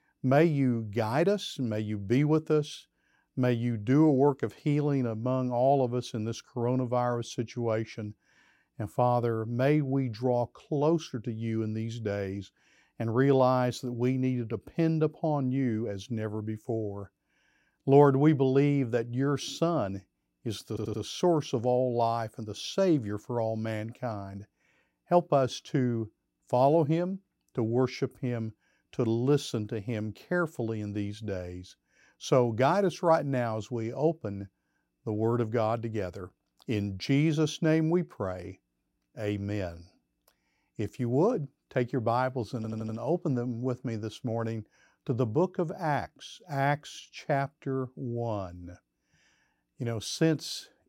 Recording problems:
audio stuttering; at 21 s and at 43 s

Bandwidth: 16 kHz